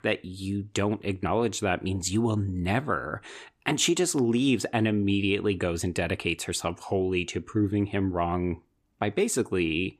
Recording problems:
none

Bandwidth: 15 kHz